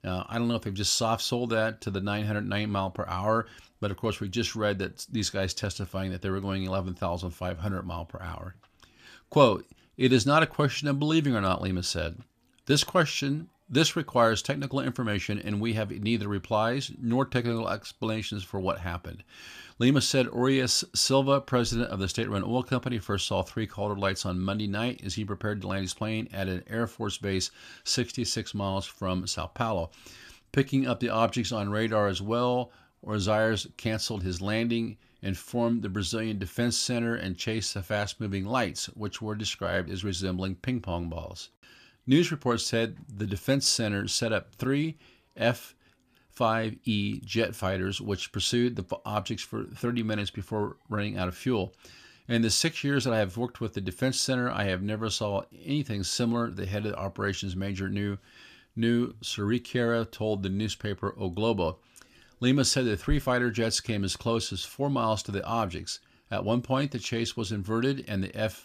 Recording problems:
none

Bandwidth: 14.5 kHz